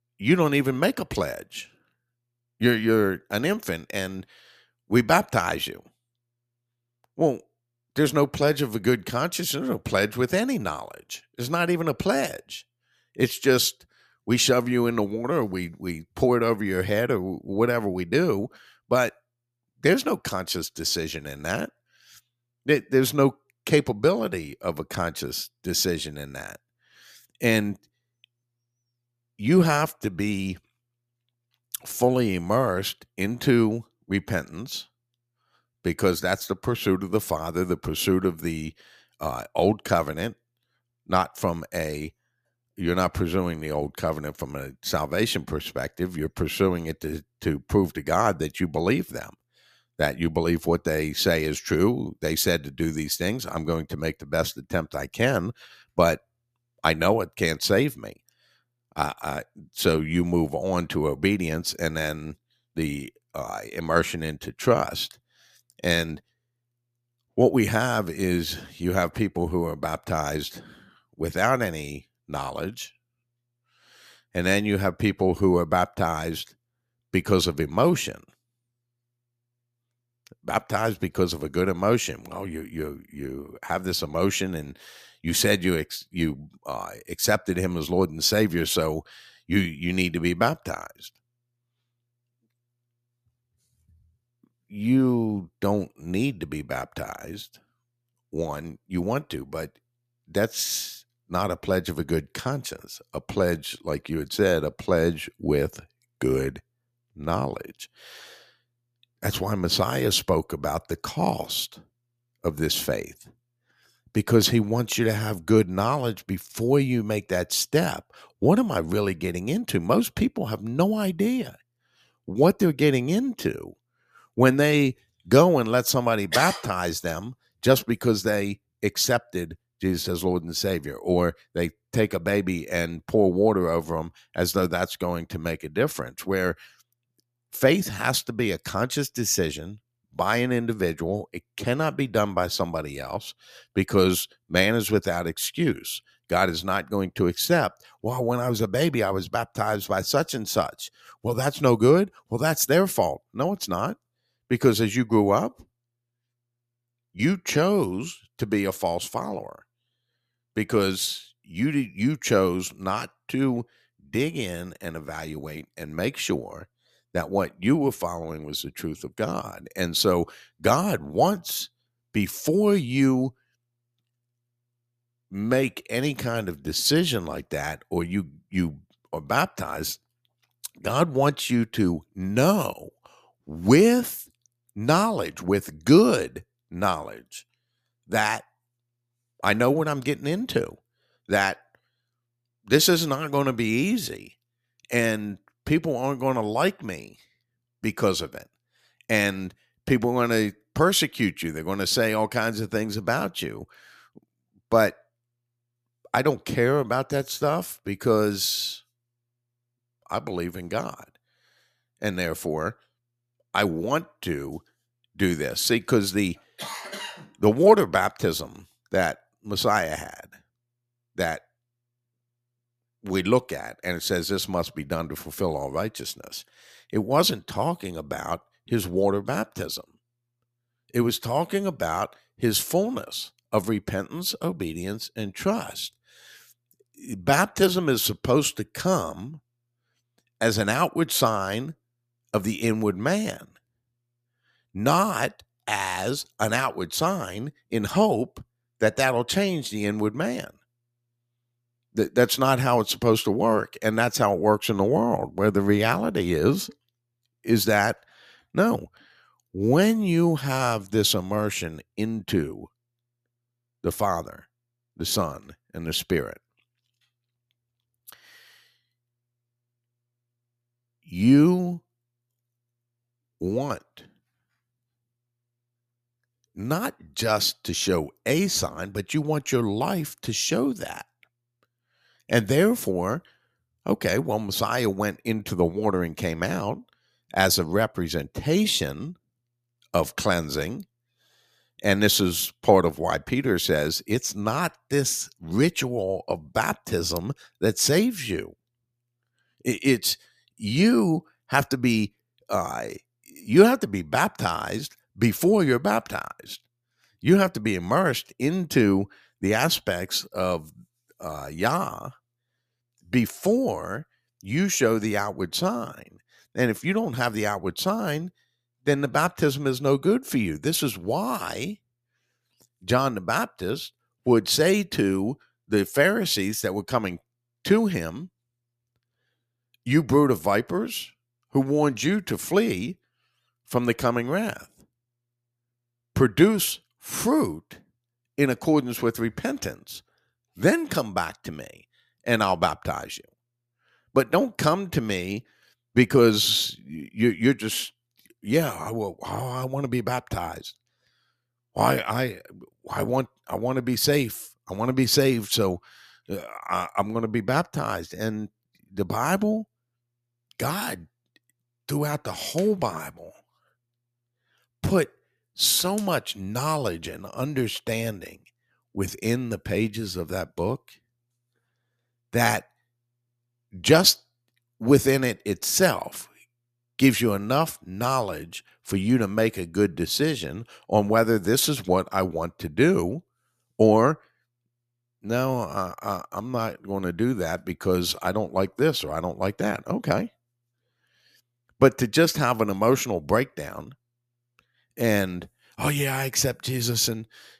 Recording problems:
none

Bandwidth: 14.5 kHz